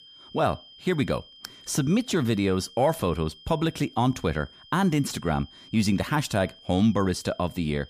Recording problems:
high-pitched whine; faint; throughout; 3 kHz, 20 dB below the speech

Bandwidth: 15 kHz